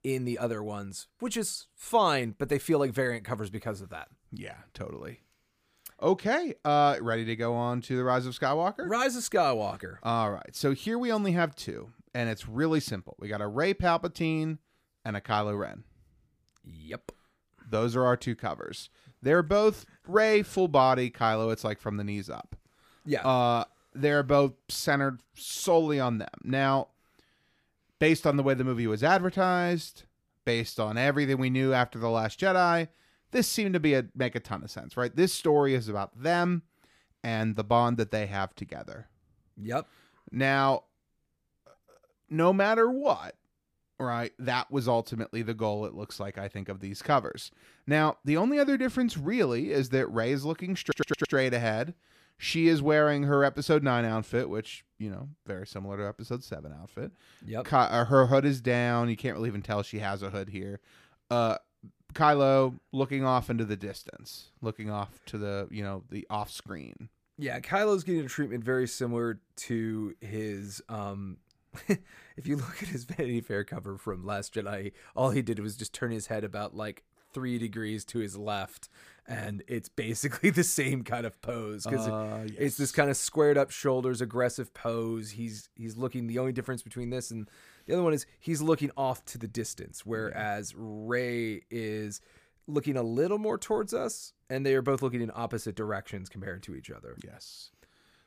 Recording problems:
audio stuttering; at 51 s

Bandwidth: 15 kHz